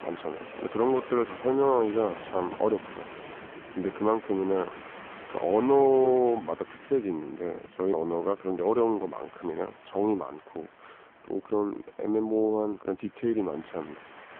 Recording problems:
phone-call audio; poor line
train or aircraft noise; noticeable; throughout; 15 dB below the speech

